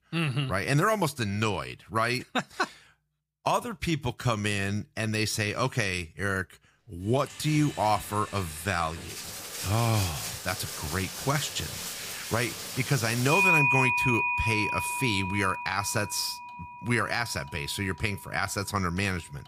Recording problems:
household noises; loud; from 7 s on; 1 dB below the speech

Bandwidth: 15 kHz